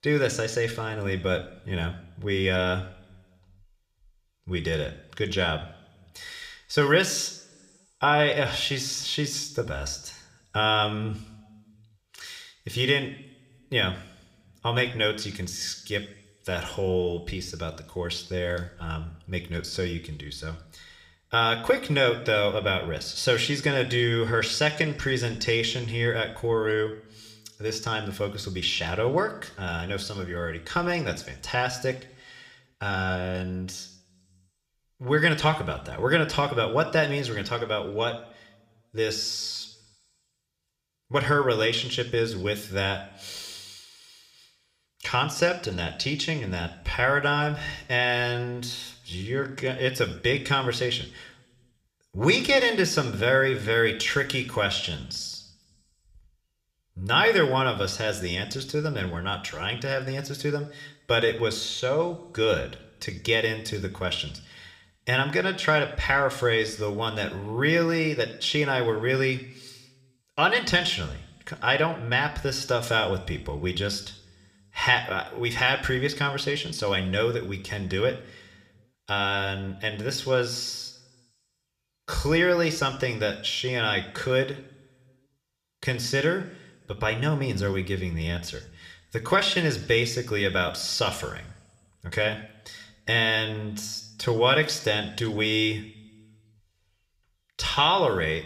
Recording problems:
room echo; very slight; dies away in 0.7 s

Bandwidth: 15 kHz